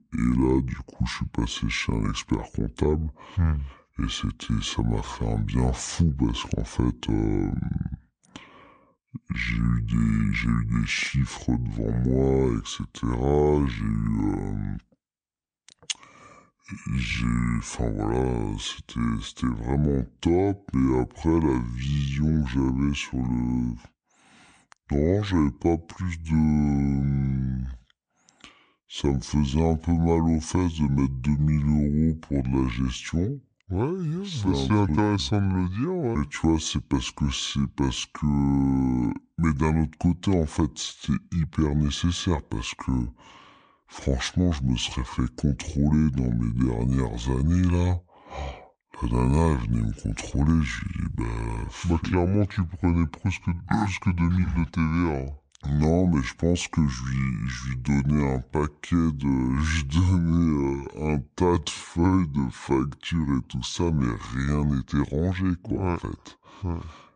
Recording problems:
wrong speed and pitch; too slow and too low; 0.6 times normal speed

